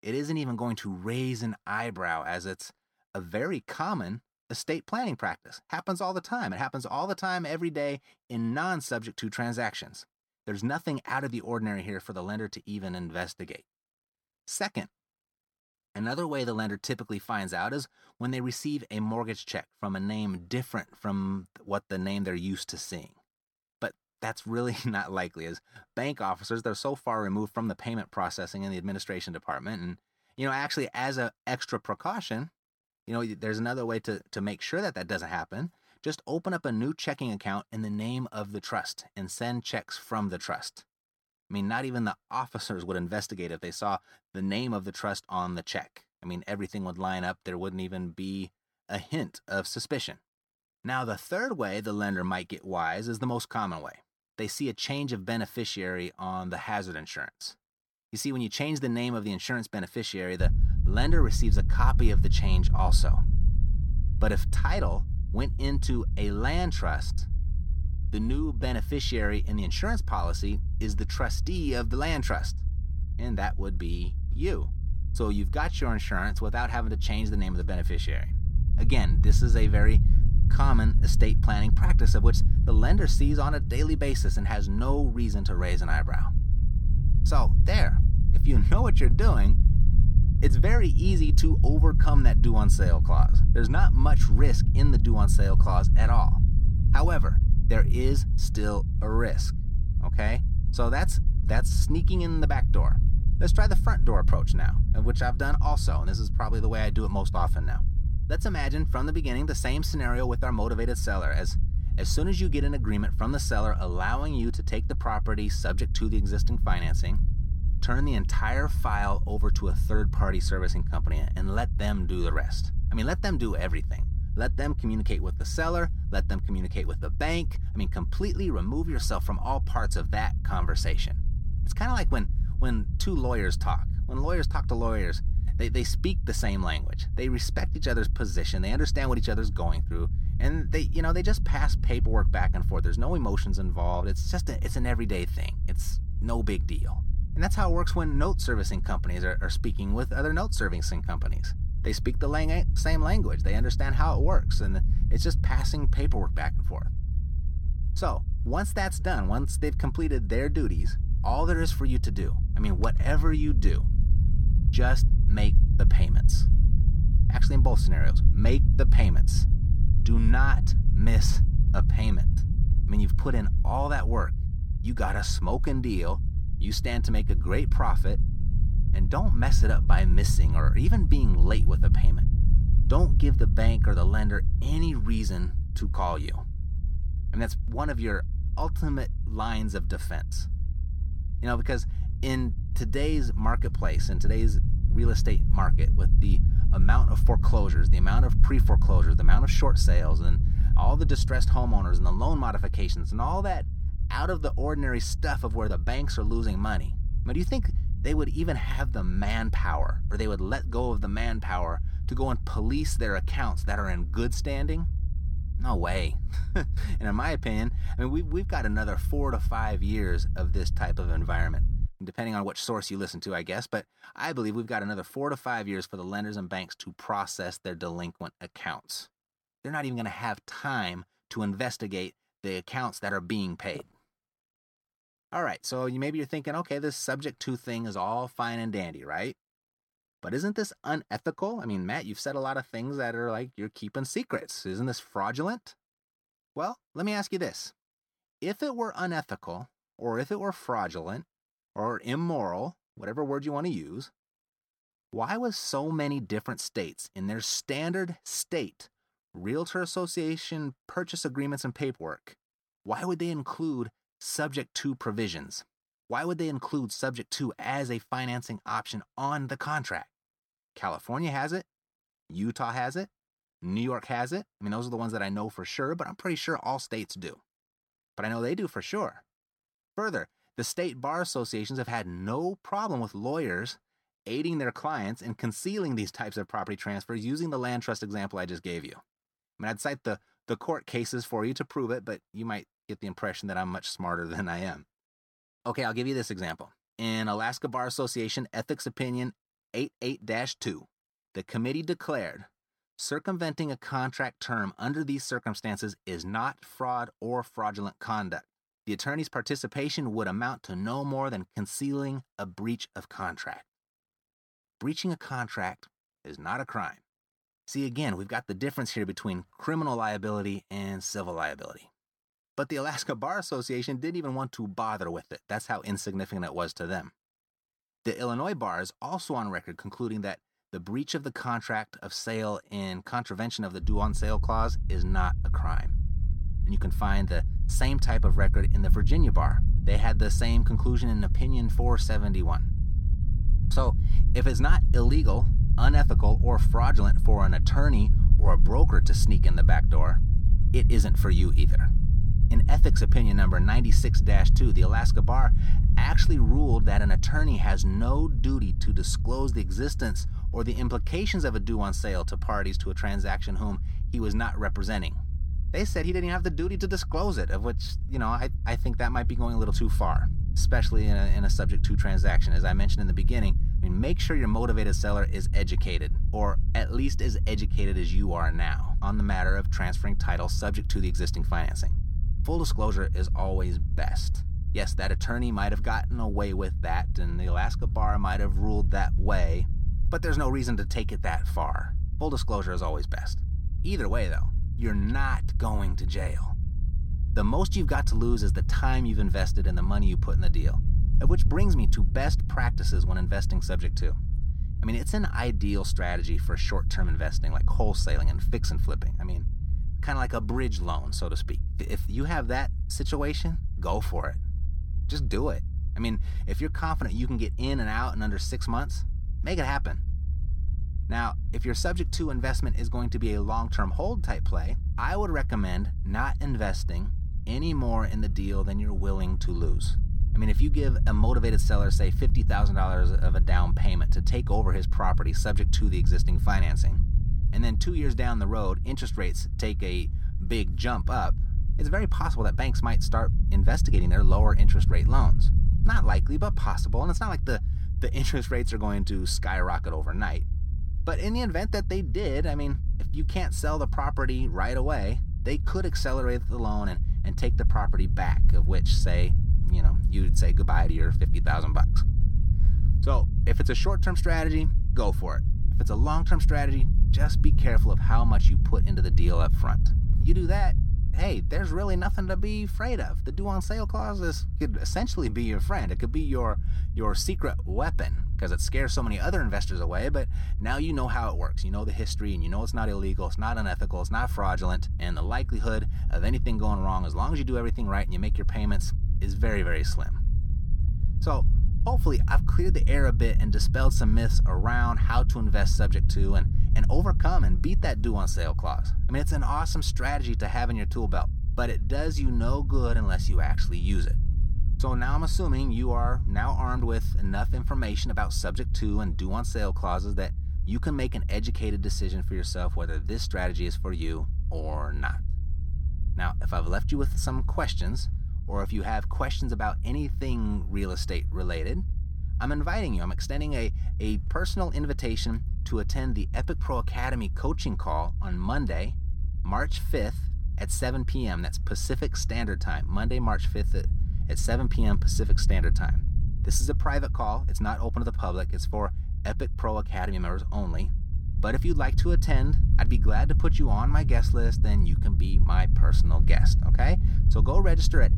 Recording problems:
low rumble; noticeable; from 1:00 to 3:42 and from 5:34 on; 10 dB below the speech

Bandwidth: 17 kHz